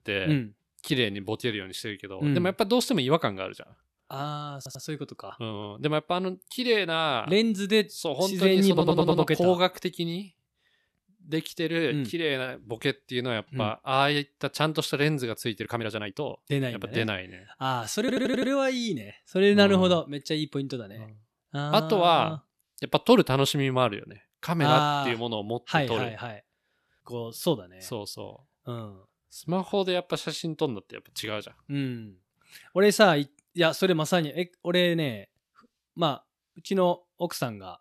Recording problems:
uneven, jittery; strongly; from 0.5 to 30 s
audio stuttering; at 4.5 s, at 8.5 s and at 18 s

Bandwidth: 13.5 kHz